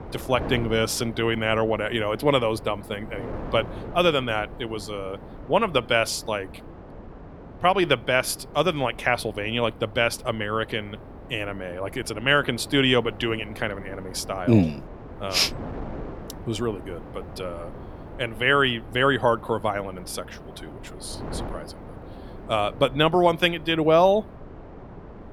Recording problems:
wind noise on the microphone; occasional gusts; 20 dB below the speech

